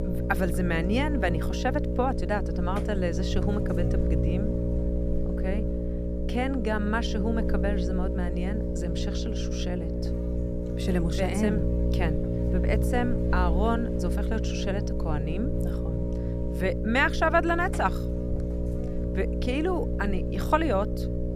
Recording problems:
electrical hum; loud; throughout; 60 Hz, 6 dB below the speech

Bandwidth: 14.5 kHz